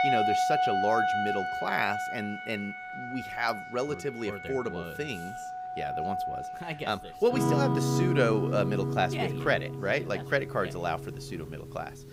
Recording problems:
background music; very loud; throughout; as loud as the speech
murmuring crowd; faint; throughout; 25 dB below the speech

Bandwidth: 15.5 kHz